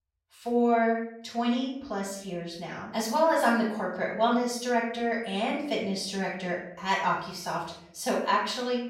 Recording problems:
off-mic speech; far
room echo; noticeable; dies away in 0.6 s

